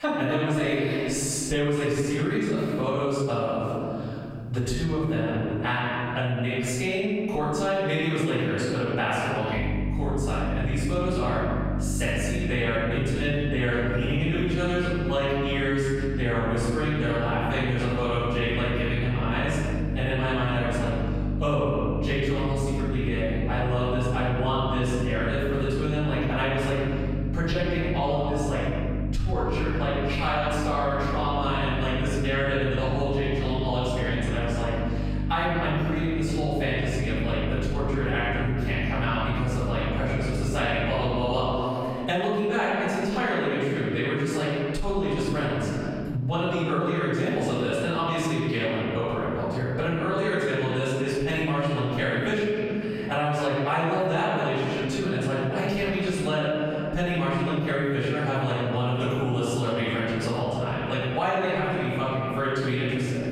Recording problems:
room echo; strong; dies away in 1.6 s
off-mic speech; far
squashed, flat; somewhat
electrical hum; noticeable; from 9.5 to 42 s; 50 Hz, 15 dB below the speech

